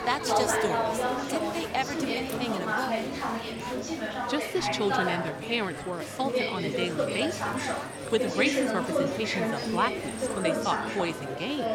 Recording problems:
chatter from many people; very loud; throughout; 1 dB above the speech

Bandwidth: 17 kHz